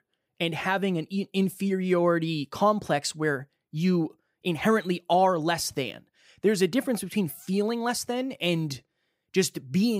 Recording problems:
abrupt cut into speech; at the end

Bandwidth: 15.5 kHz